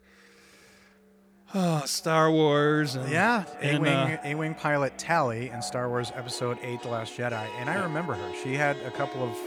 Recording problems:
echo of what is said; noticeable; throughout; 420 ms later, 20 dB below the speech
background music; noticeable; throughout; 15 dB below the speech

